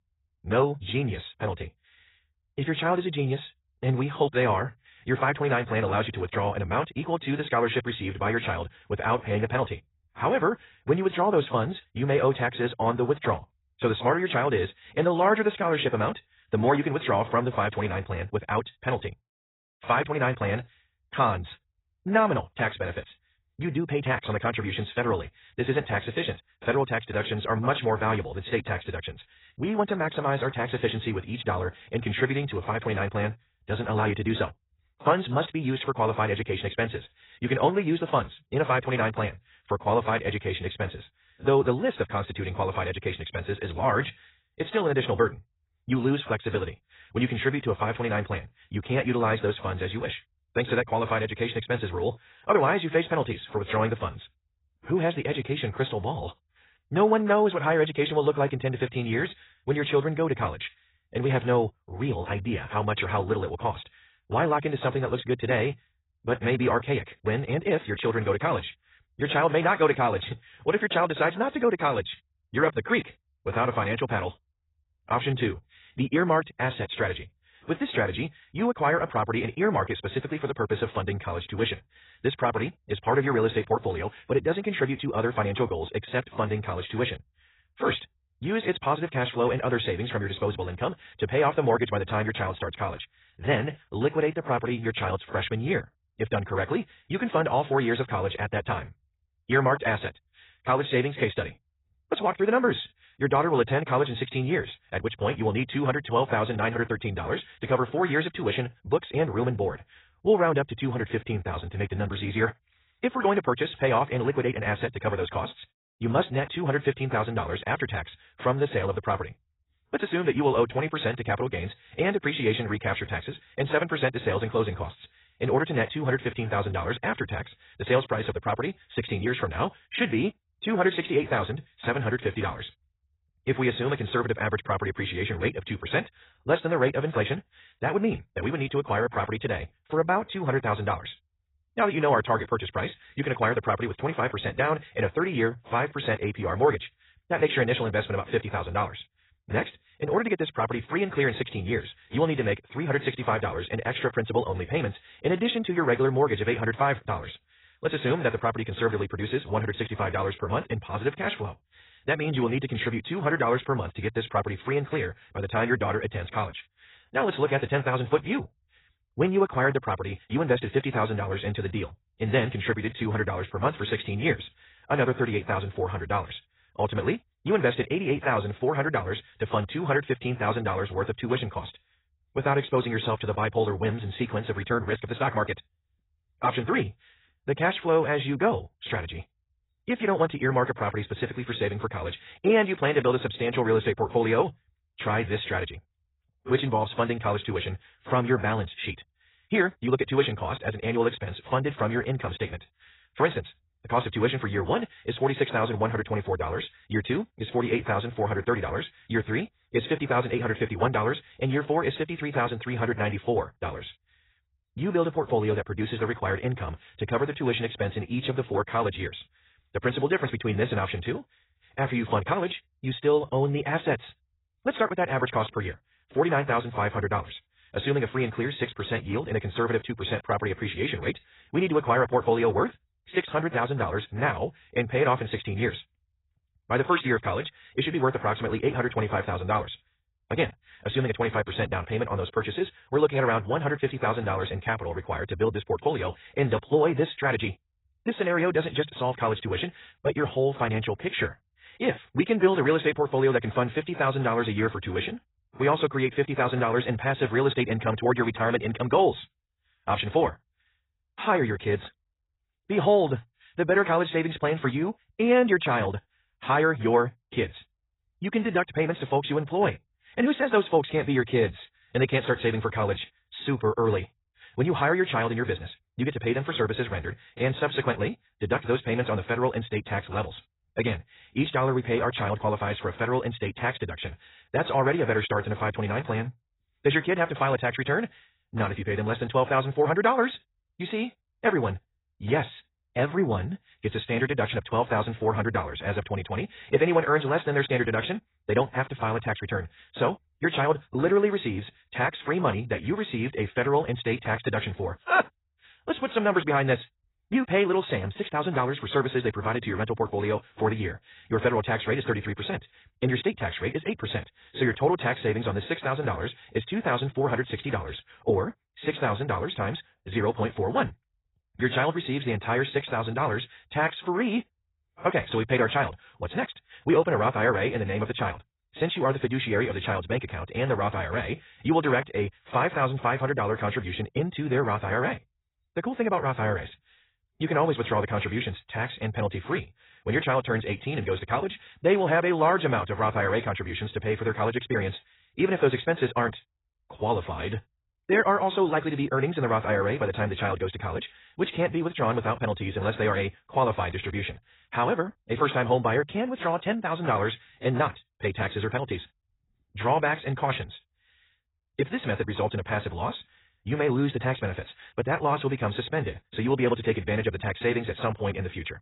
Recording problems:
garbled, watery; badly; nothing above 4 kHz
wrong speed, natural pitch; too fast; 1.5 times normal speed

